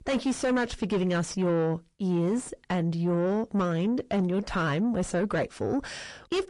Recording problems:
distortion; heavy; 7 dB below the speech
garbled, watery; slightly; nothing above 9.5 kHz

